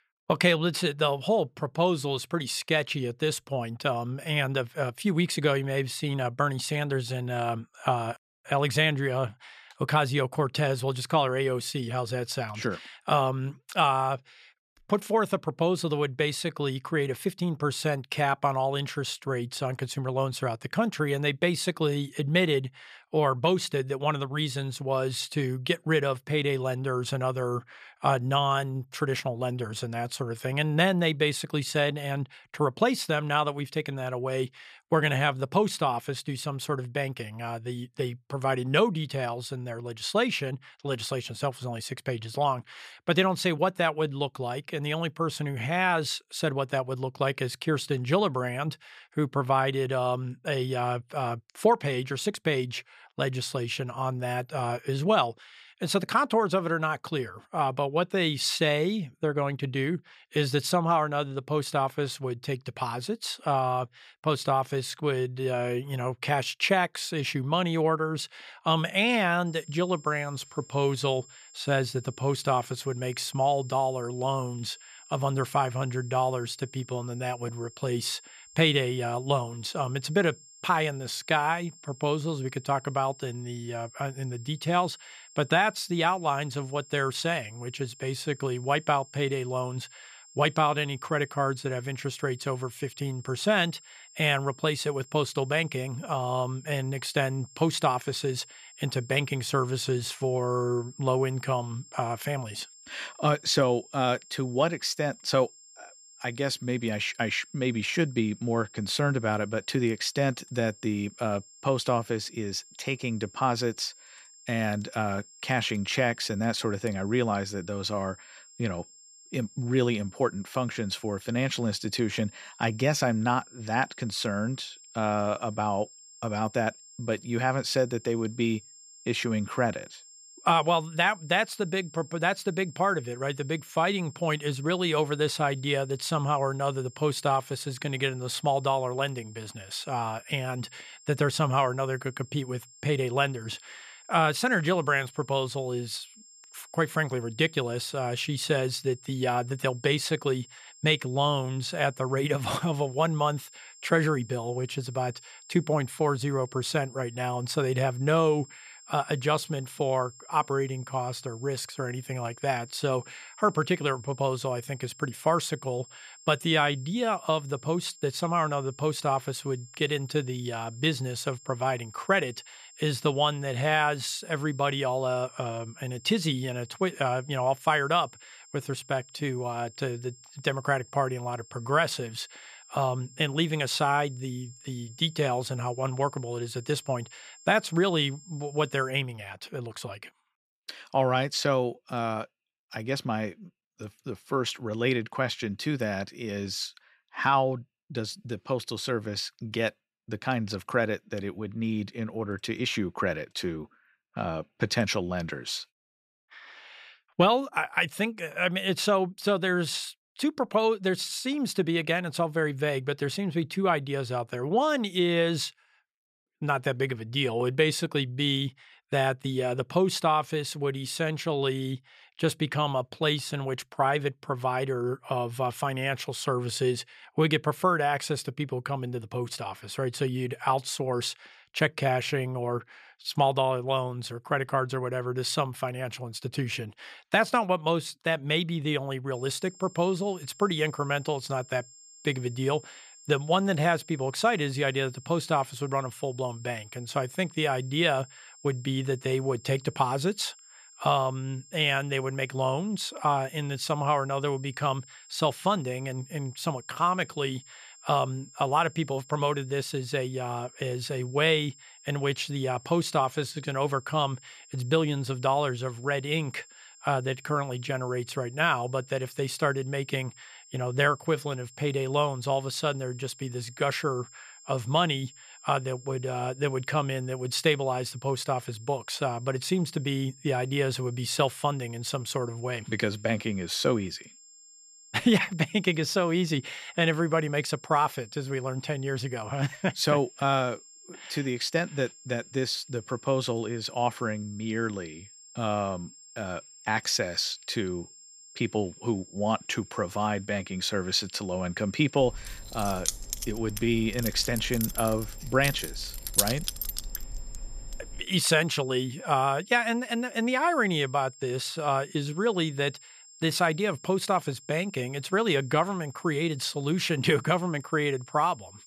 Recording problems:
high-pitched whine; faint; from 1:09 to 3:09 and from 3:59 on; 7.5 kHz, 20 dB below the speech
jangling keys; loud; from 5:02 to 5:08; peak 3 dB above the speech

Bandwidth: 14.5 kHz